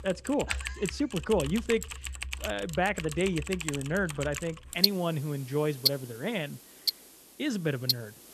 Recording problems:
household noises; loud; throughout; 1 dB below the speech

